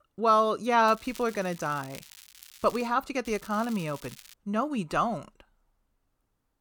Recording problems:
crackling; faint; from 1 to 3 s and from 3.5 to 4.5 s; 20 dB below the speech

